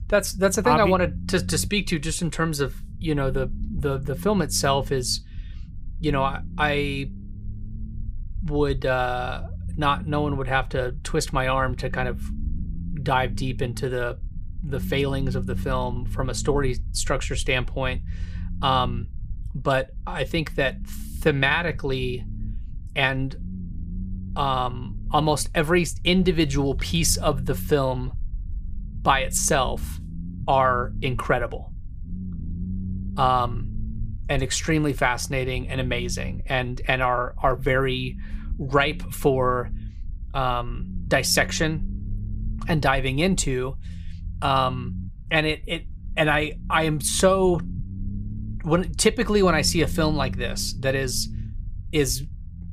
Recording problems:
low rumble; faint; throughout; 25 dB below the speech

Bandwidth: 15 kHz